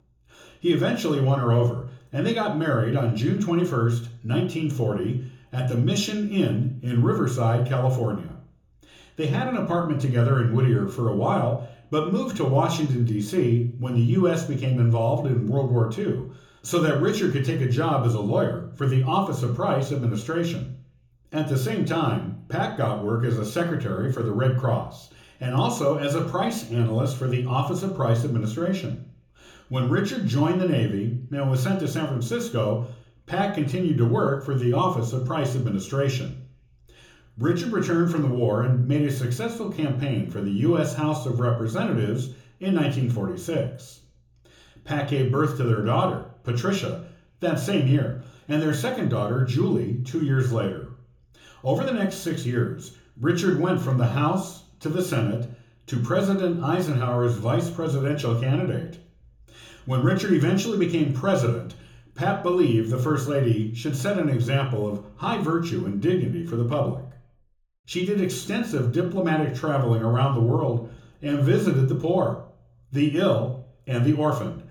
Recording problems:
room echo; slight; dies away in 0.6 s
off-mic speech; somewhat distant

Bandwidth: 18.5 kHz